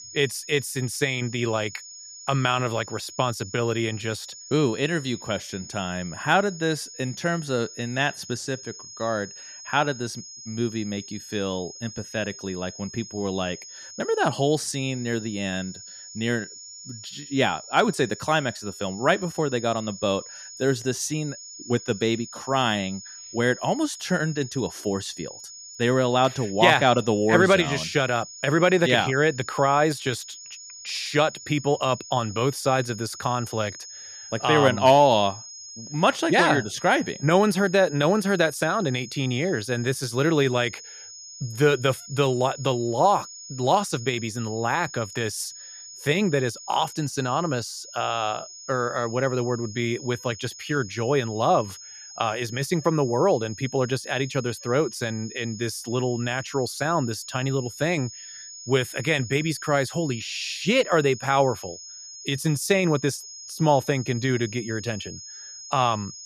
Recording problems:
high-pitched whine; noticeable; throughout; 6.5 kHz, 15 dB below the speech

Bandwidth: 14.5 kHz